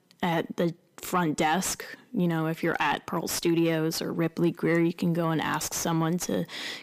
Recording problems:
distortion; slight; 10 dB below the speech

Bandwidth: 15 kHz